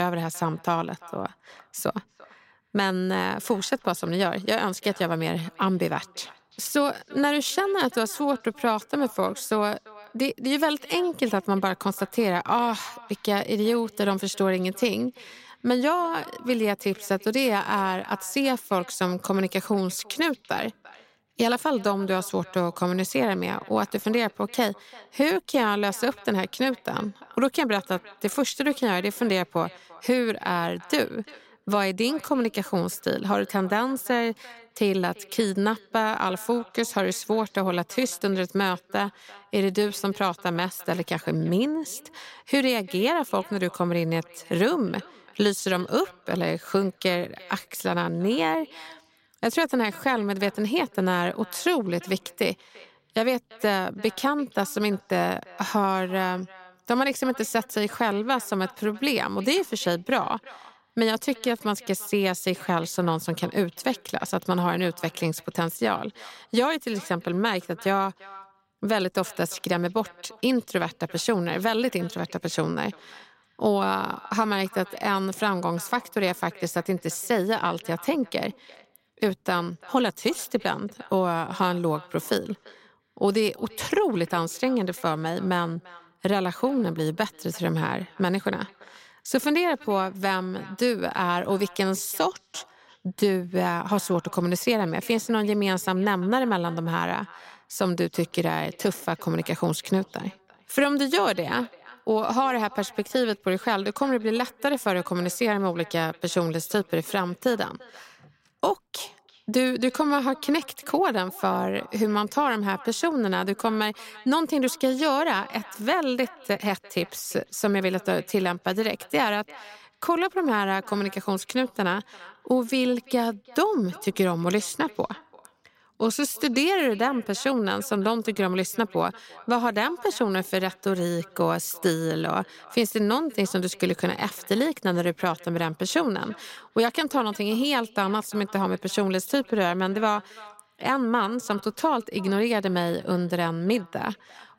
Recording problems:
echo of what is said; faint; throughout; 340 ms later, 25 dB below the speech
abrupt cut into speech; at the start

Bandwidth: 16 kHz